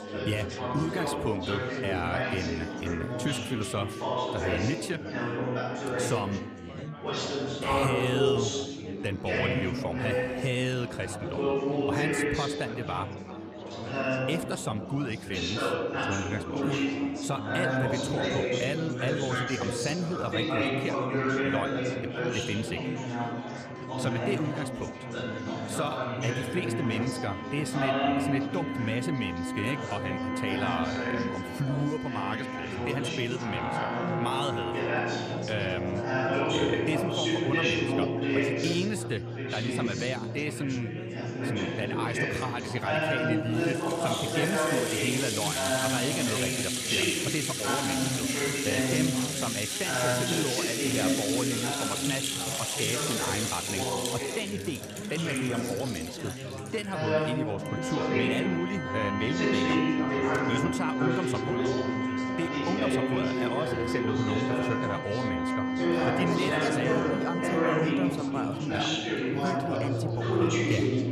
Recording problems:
background music; very loud; throughout; as loud as the speech
chatter from many people; very loud; throughout; 3 dB above the speech

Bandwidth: 14.5 kHz